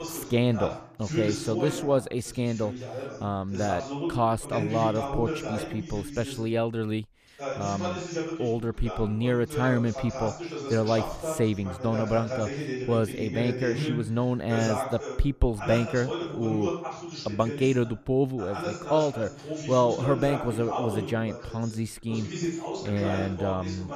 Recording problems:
voice in the background; loud; throughout; 6 dB below the speech

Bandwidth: 14.5 kHz